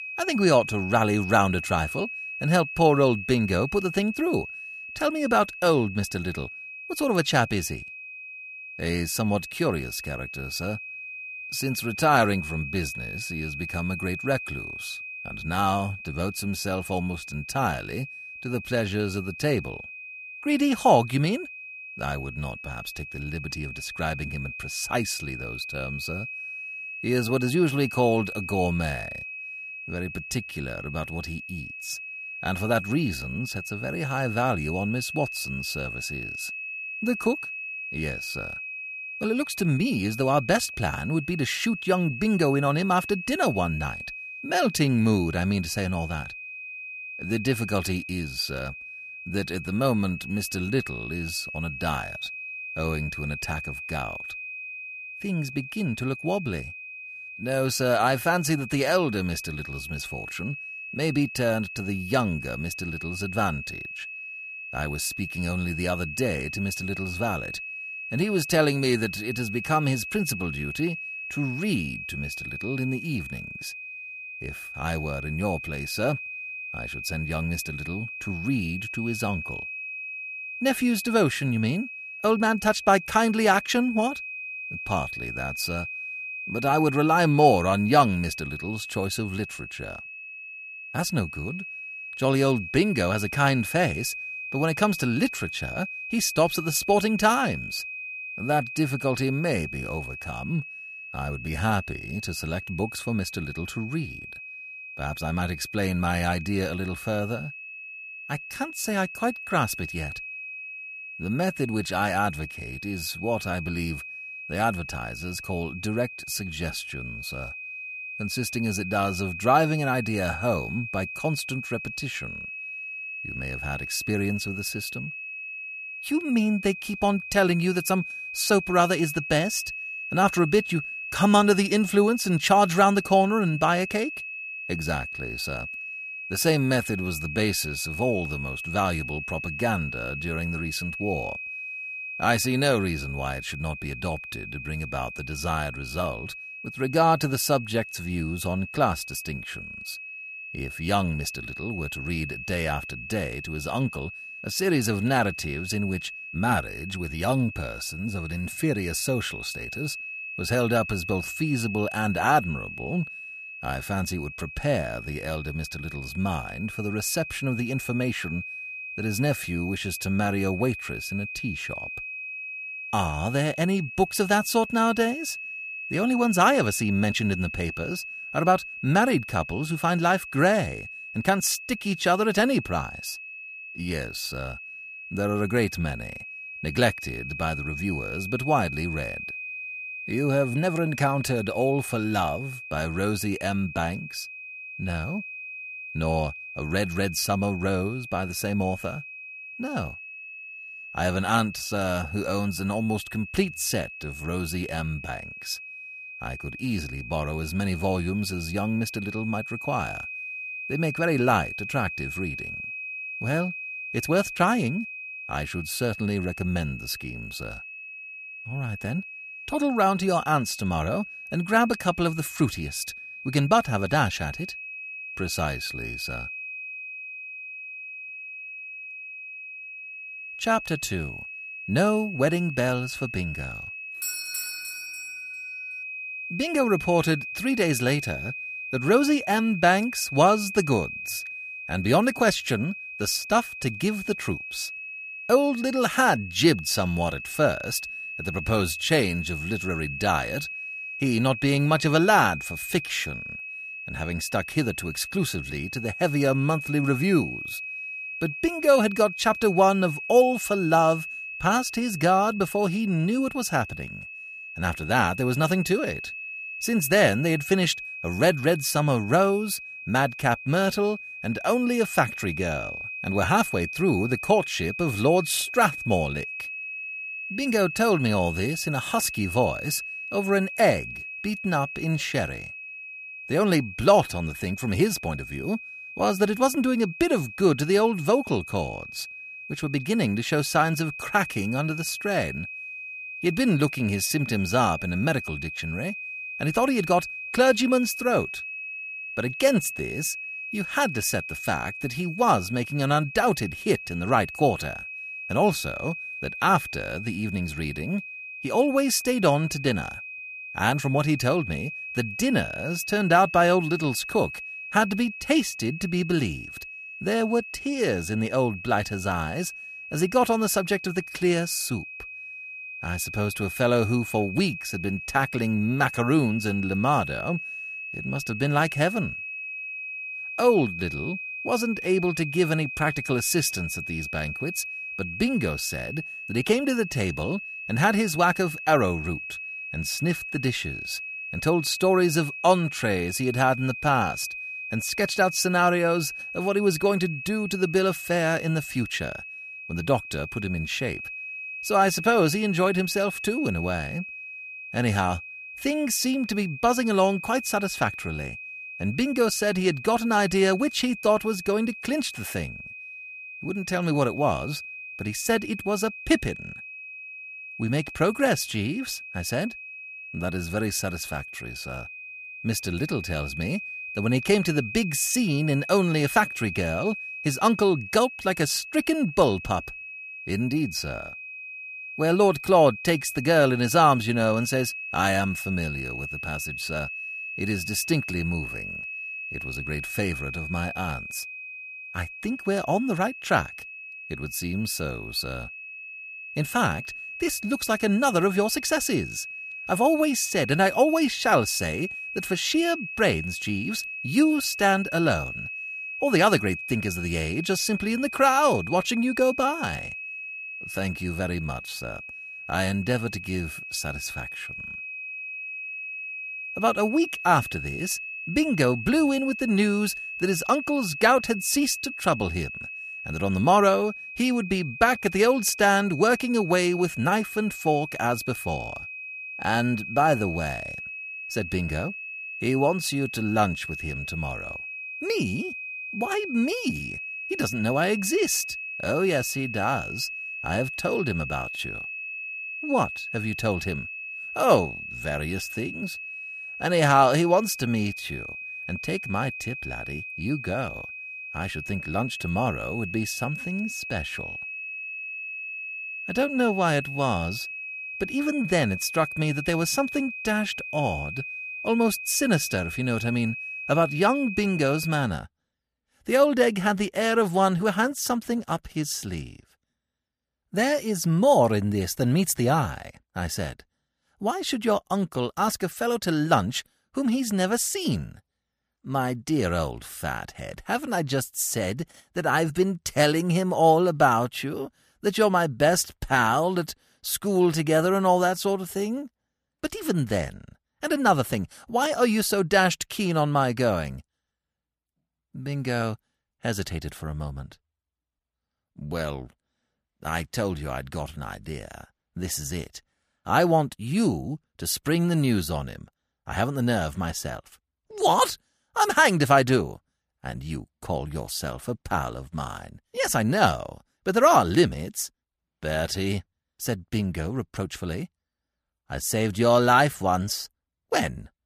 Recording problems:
high-pitched whine; loud; until 7:45; 2.5 kHz, 9 dB below the speech
doorbell; noticeable; from 3:54 to 3:55; peak 3 dB below the speech

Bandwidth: 14.5 kHz